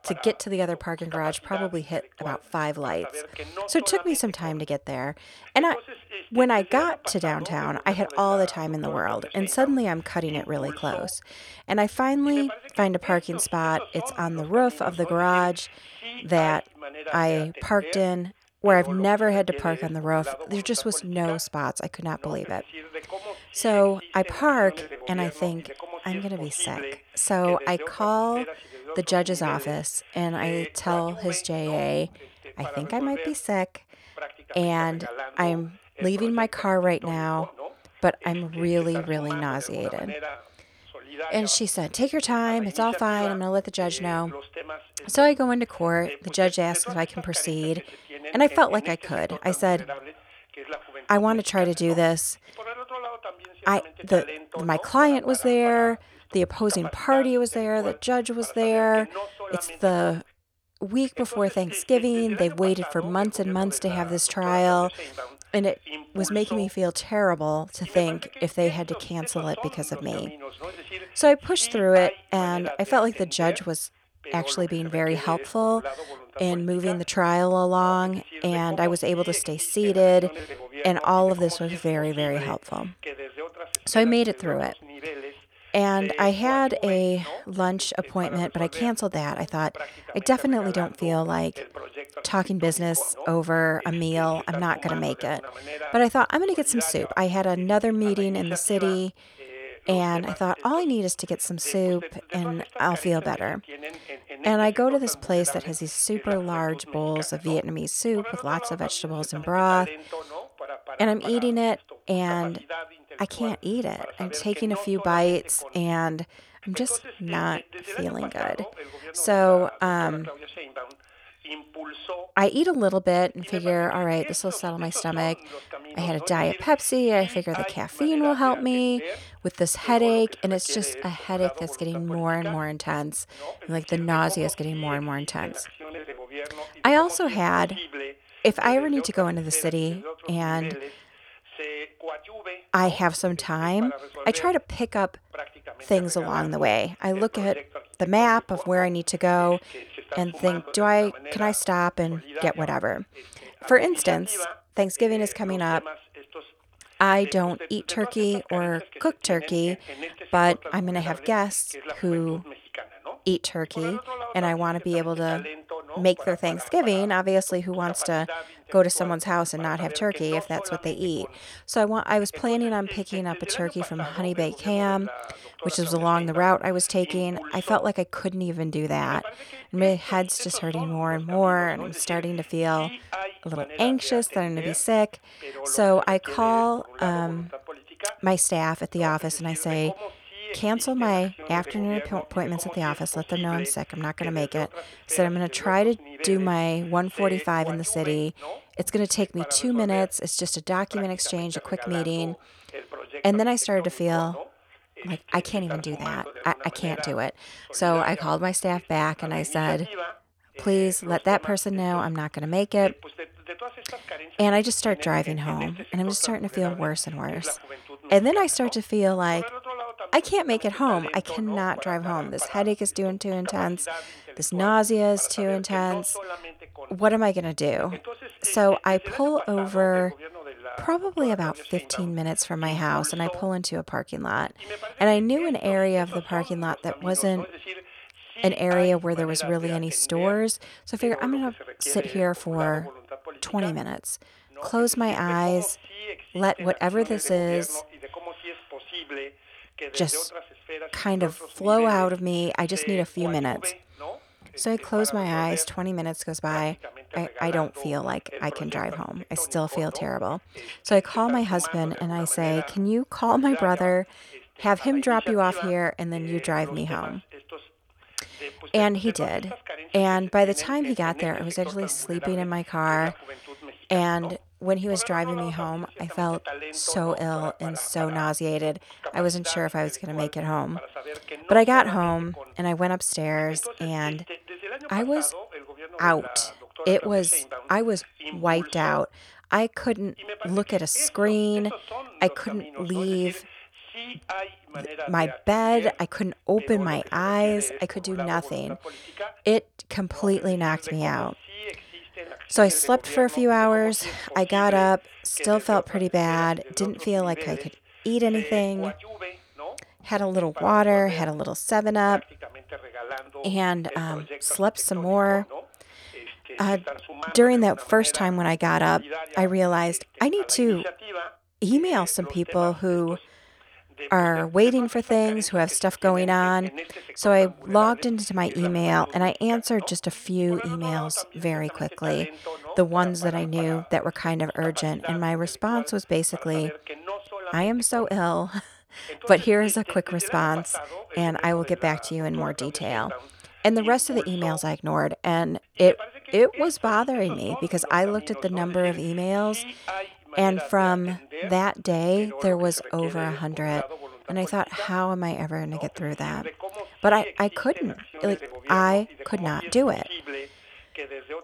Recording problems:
voice in the background; noticeable; throughout; 15 dB below the speech

